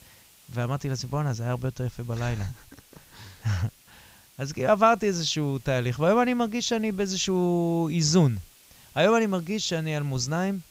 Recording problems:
high frequencies cut off; noticeable; nothing above 8 kHz
hiss; faint; throughout; 25 dB below the speech

